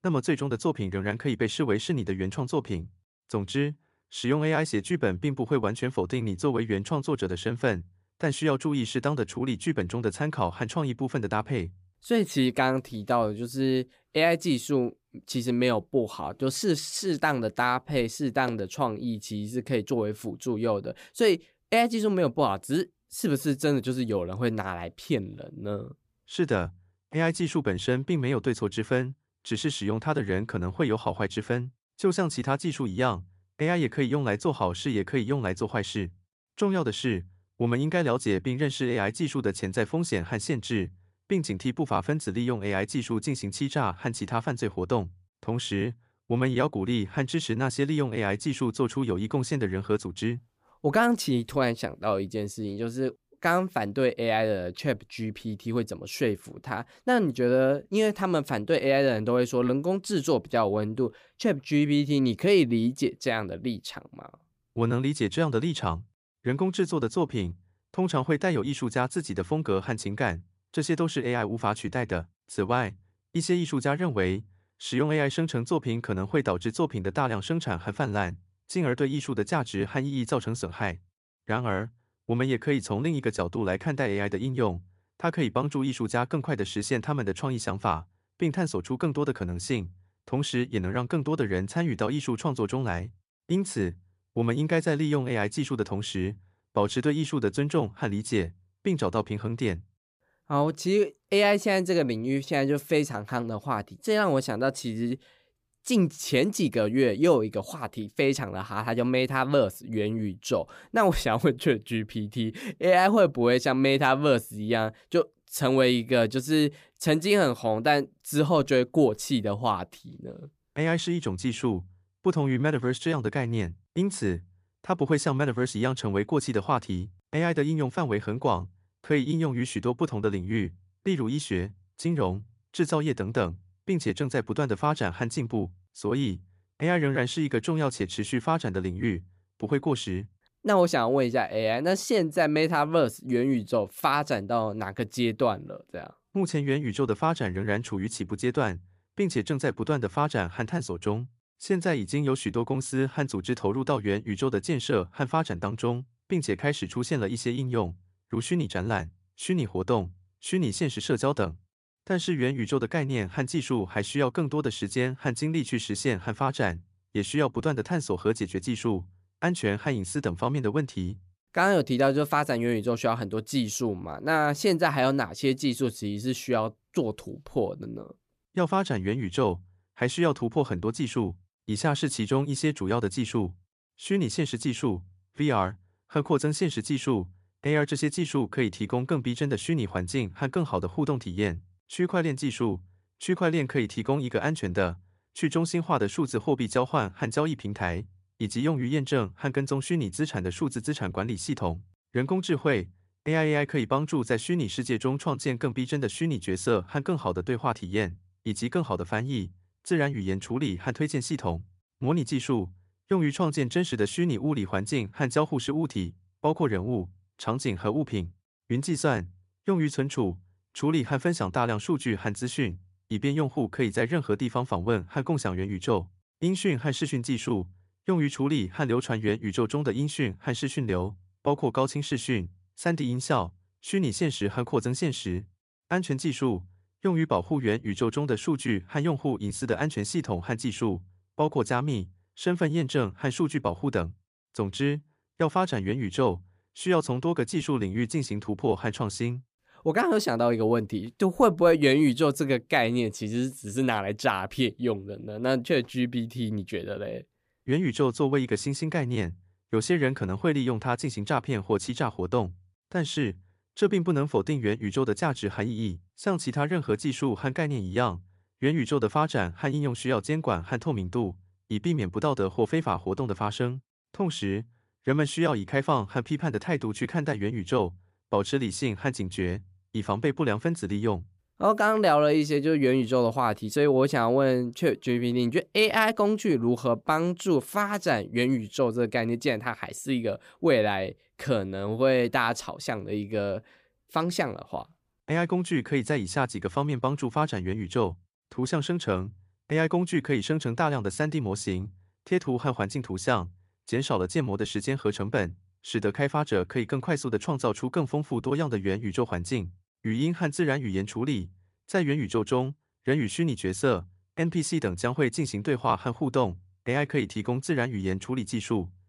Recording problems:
none

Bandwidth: 15 kHz